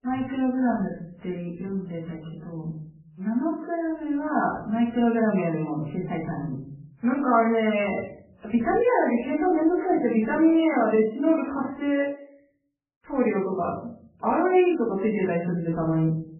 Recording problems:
off-mic speech; far
garbled, watery; badly; nothing above 3 kHz
room echo; slight; dies away in 0.6 s

